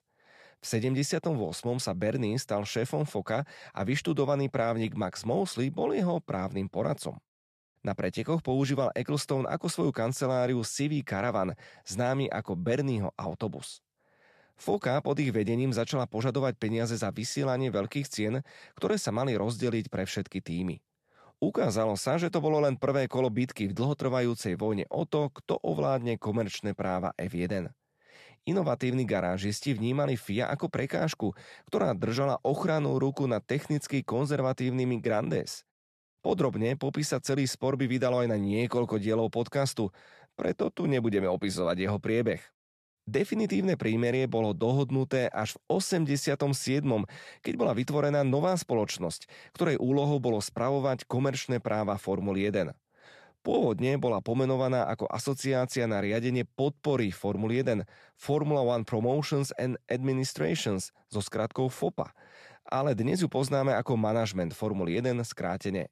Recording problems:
none

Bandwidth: 13.5 kHz